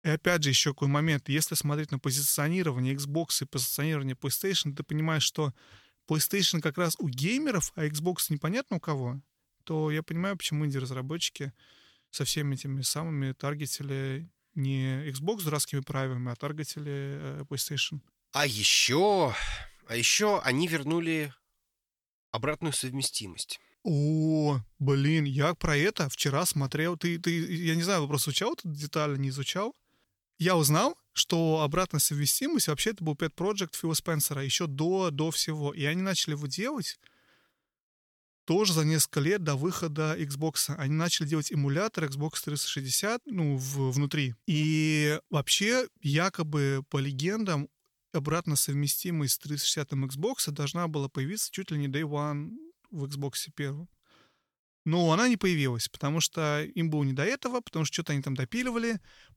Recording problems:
none

